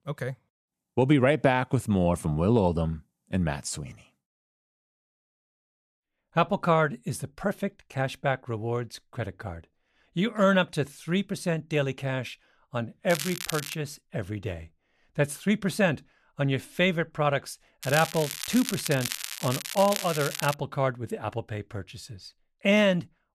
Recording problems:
crackling; loud; at 13 s and from 18 to 21 s; 6 dB below the speech

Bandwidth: 13.5 kHz